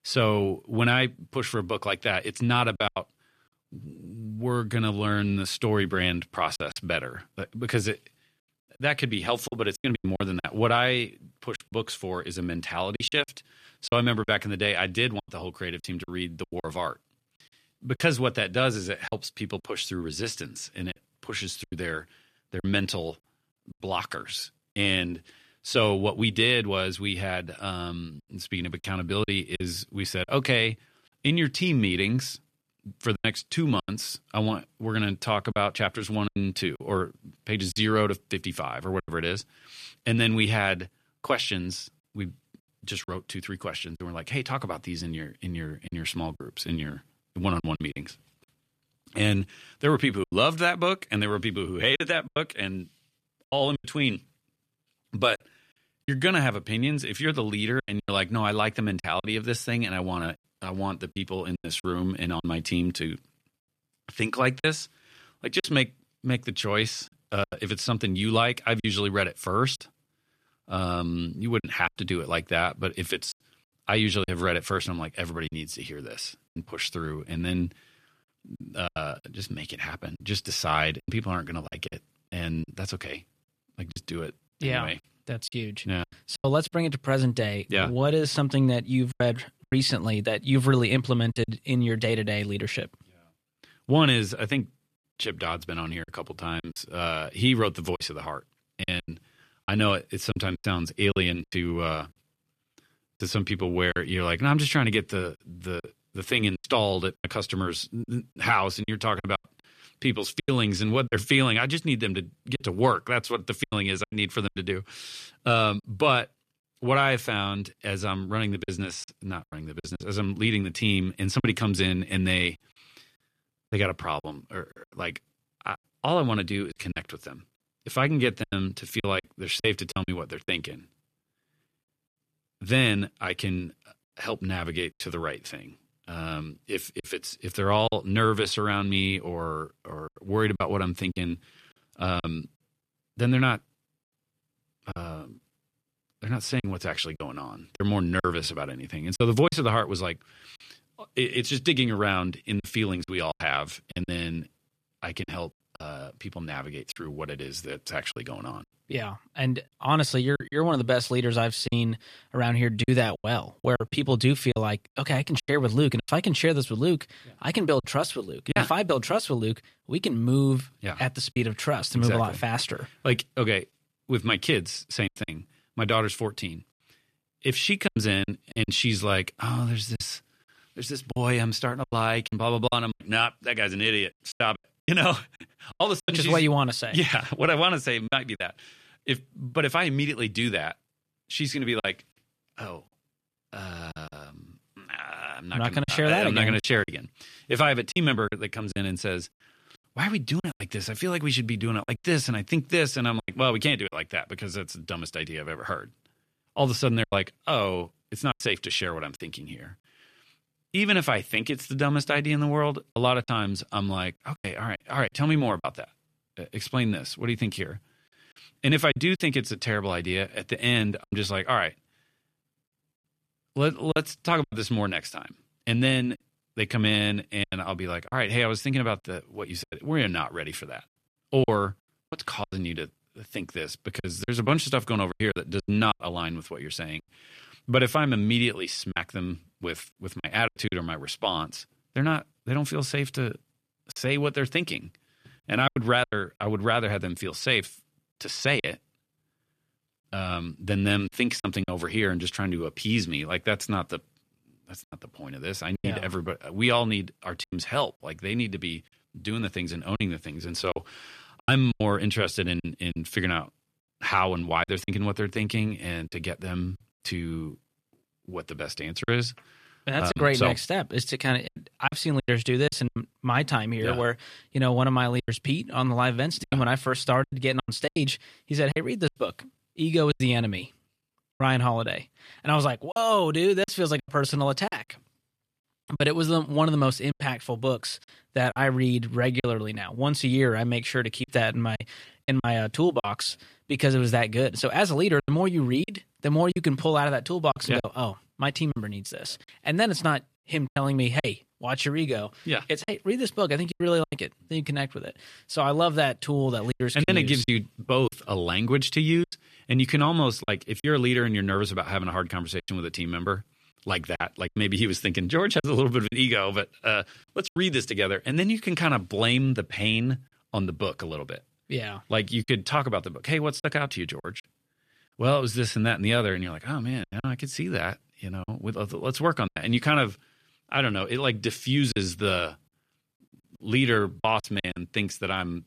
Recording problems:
choppy; very; 6% of the speech affected

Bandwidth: 14.5 kHz